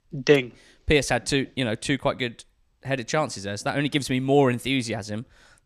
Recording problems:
none

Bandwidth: 14 kHz